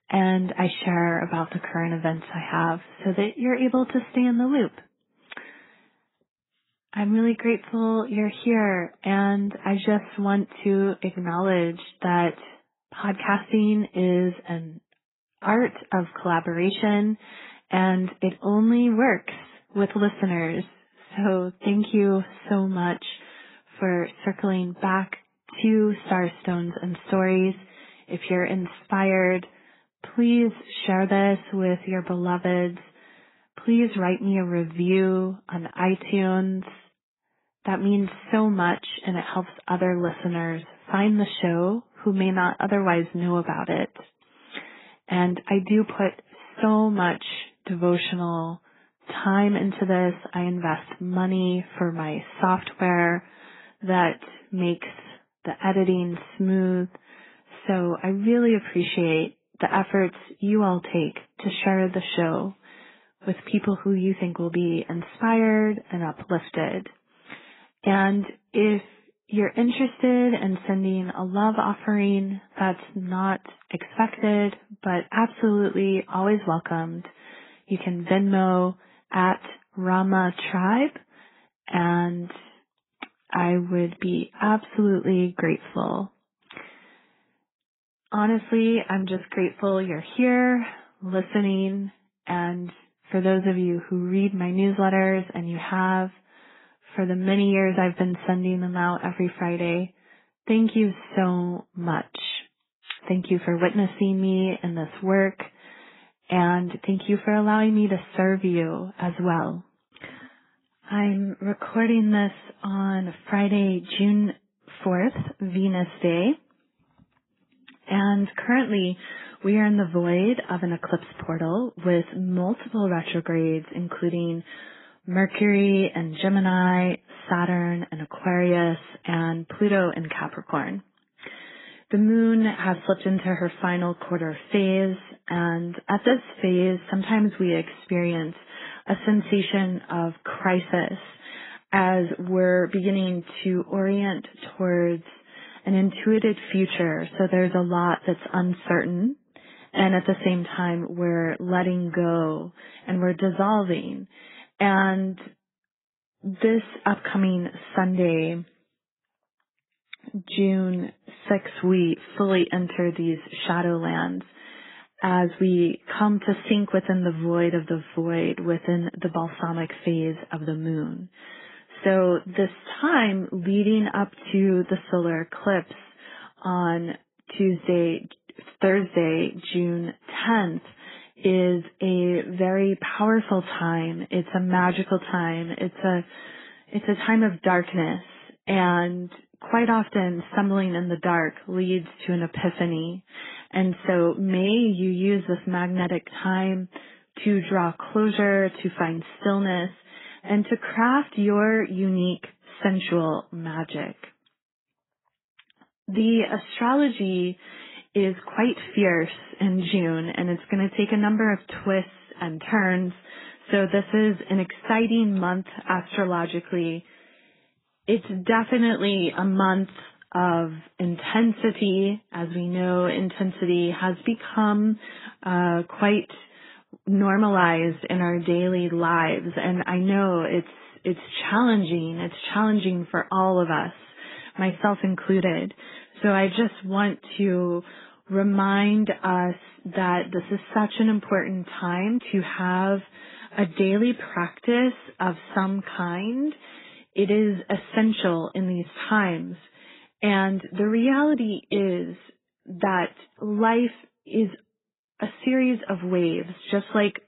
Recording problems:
garbled, watery; badly; nothing above 4 kHz

